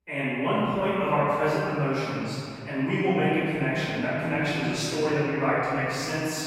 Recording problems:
room echo; strong; dies away in 2.8 s
off-mic speech; far

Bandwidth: 16 kHz